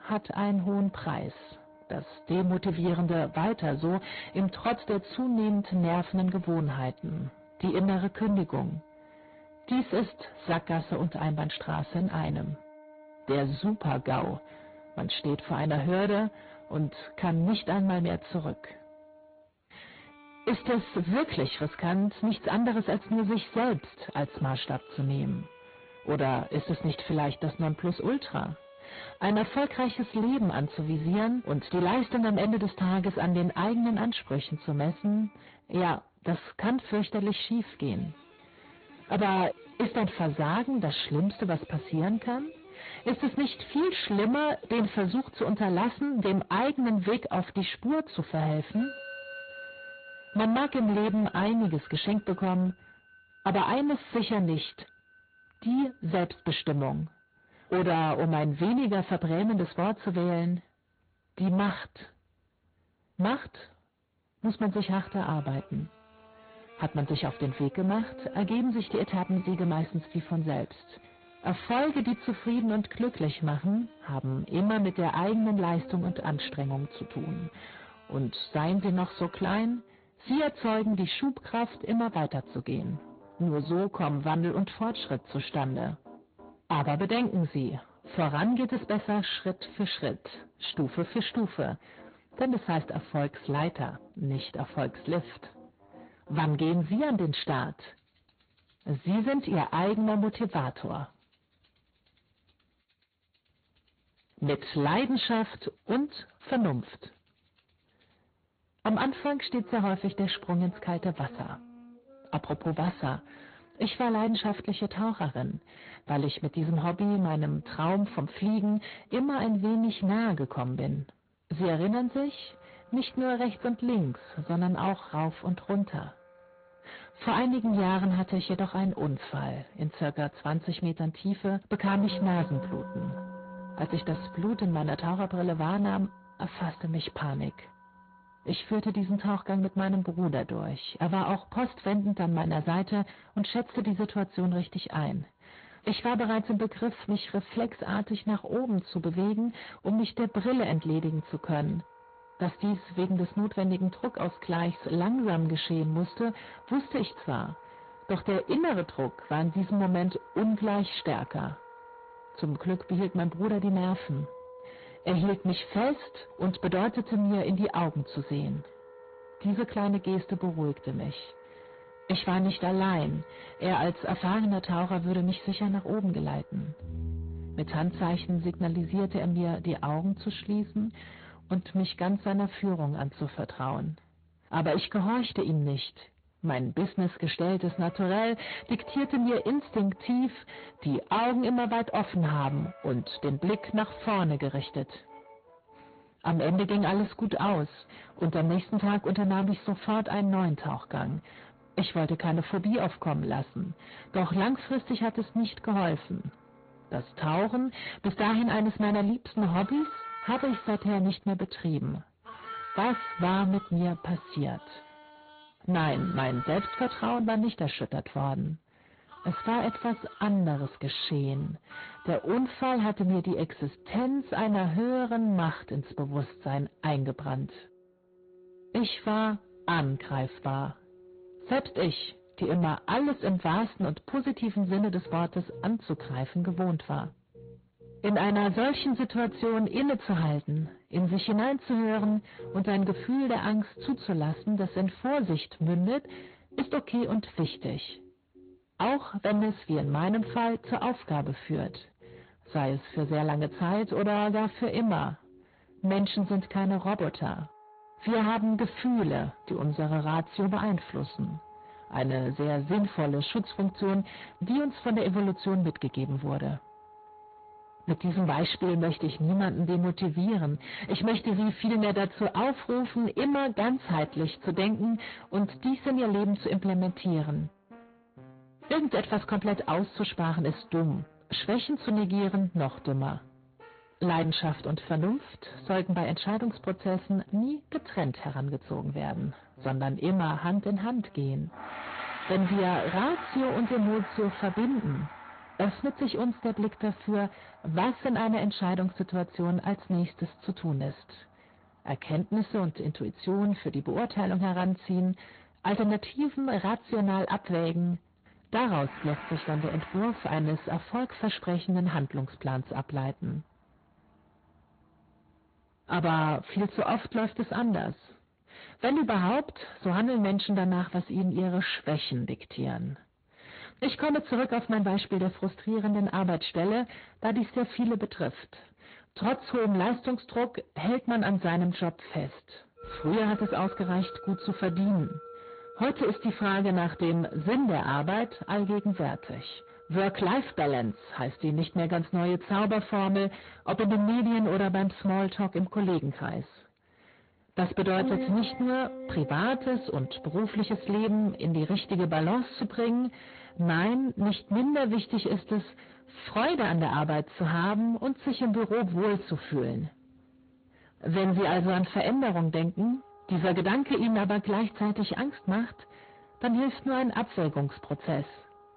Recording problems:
distortion; heavy; 8 dB below the speech
high frequencies cut off; severe; nothing above 4.5 kHz
garbled, watery; slightly
background music; noticeable; throughout; 20 dB below the speech

